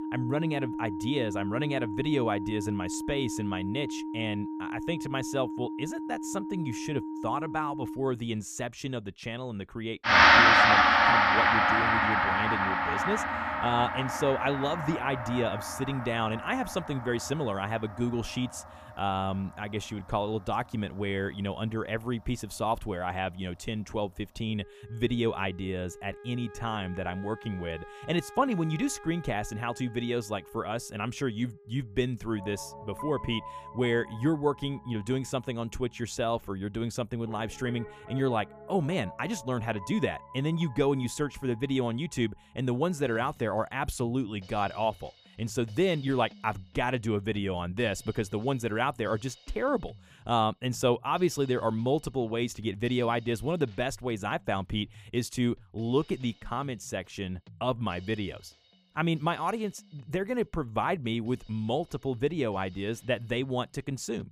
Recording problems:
background music; very loud; throughout; 4 dB above the speech

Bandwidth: 15 kHz